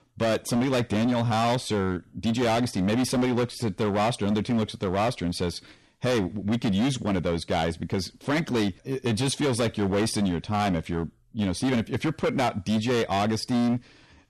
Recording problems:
distortion; heavy; 19% of the sound clipped

